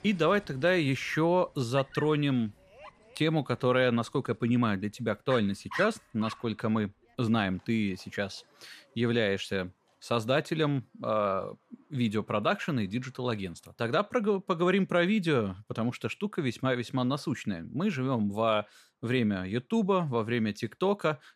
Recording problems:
animal sounds; noticeable; throughout; 15 dB below the speech

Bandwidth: 14.5 kHz